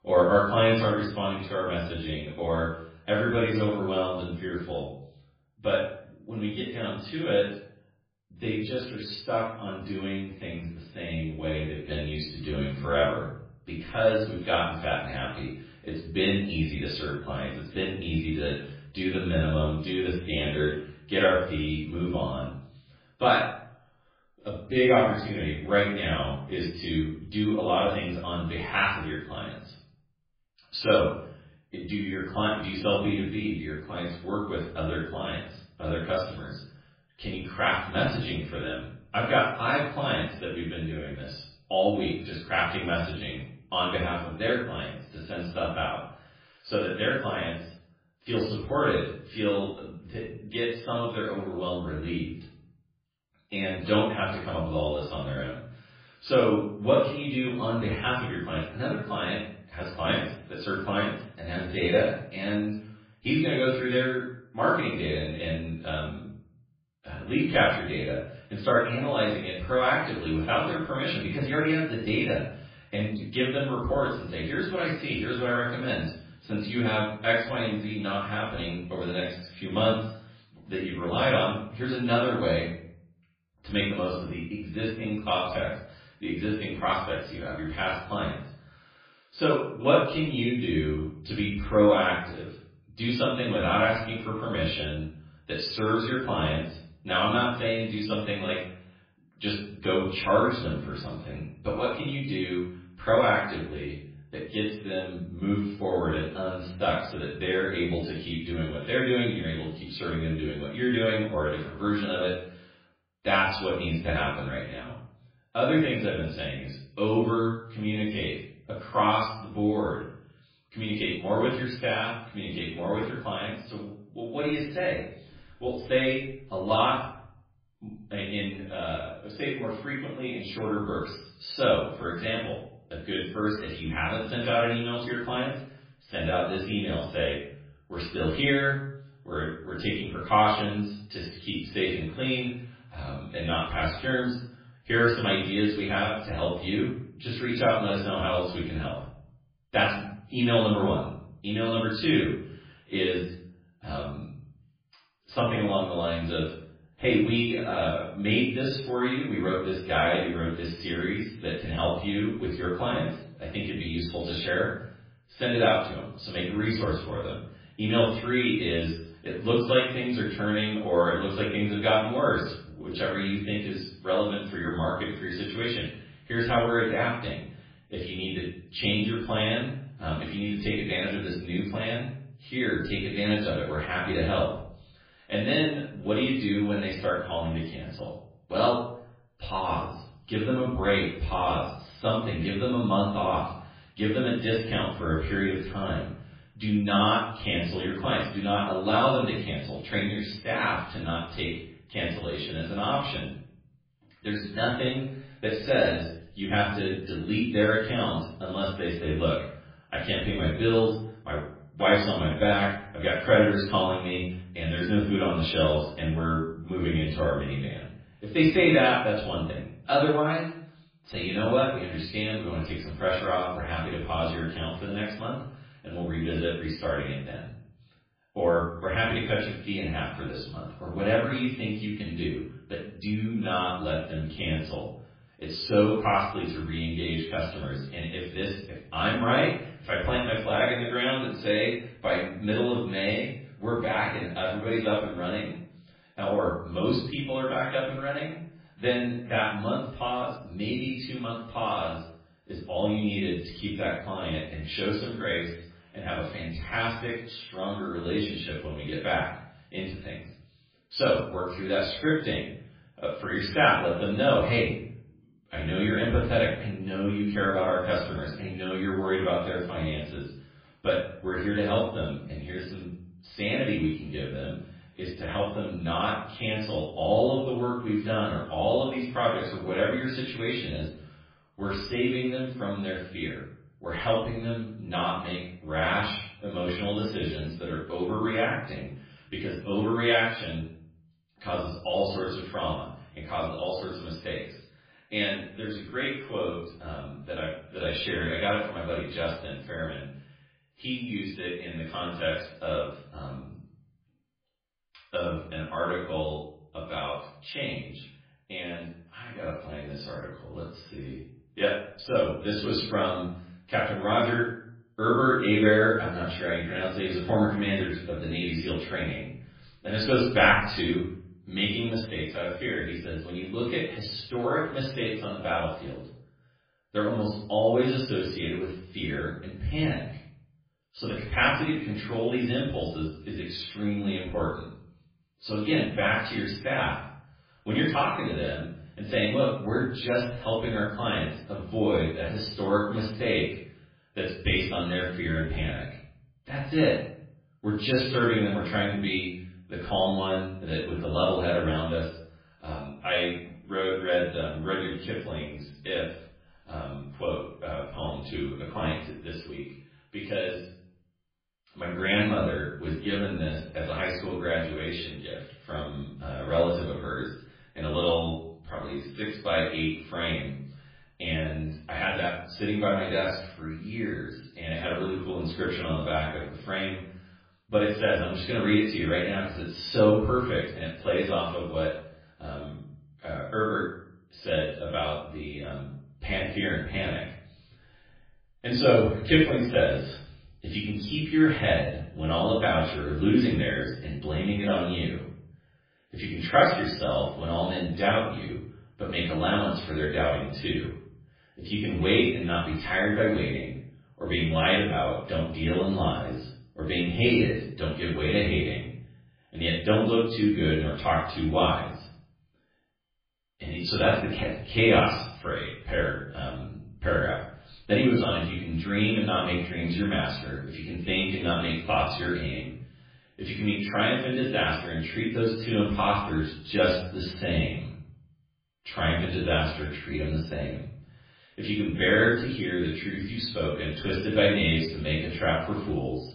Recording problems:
off-mic speech; far
garbled, watery; badly
room echo; noticeable; dies away in 0.5 s

